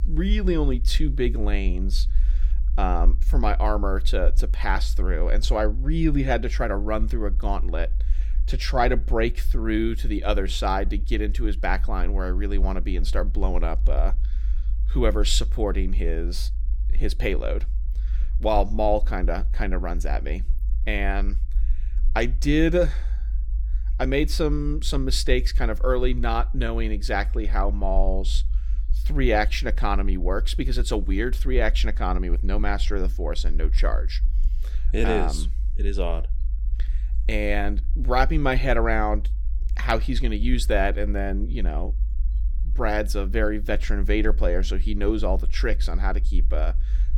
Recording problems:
low rumble; faint; throughout; 25 dB below the speech

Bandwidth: 17 kHz